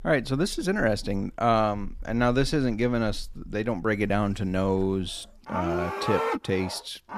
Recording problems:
animal sounds; loud; throughout; 7 dB below the speech

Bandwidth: 14.5 kHz